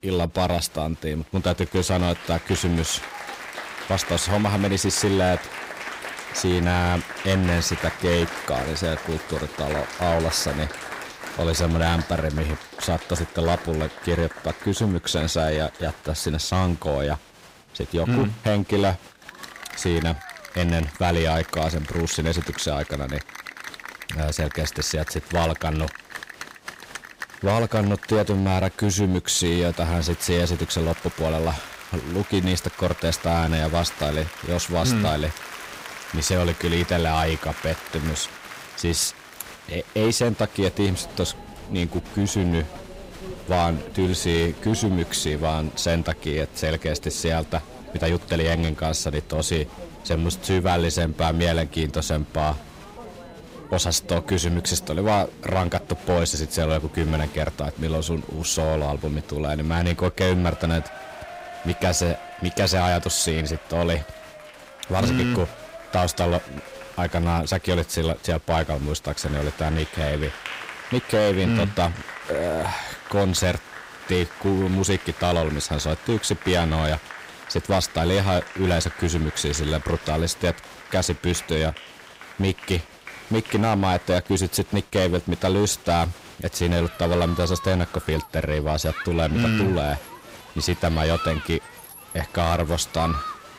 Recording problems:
distortion; slight; 6% of the sound clipped
crowd noise; noticeable; throughout; 15 dB below the speech

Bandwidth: 15.5 kHz